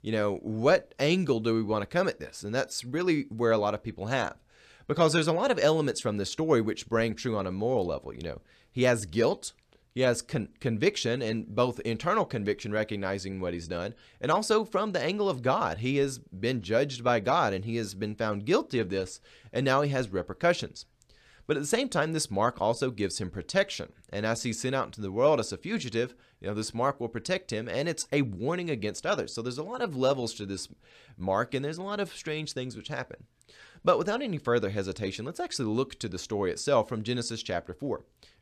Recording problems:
none

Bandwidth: 14 kHz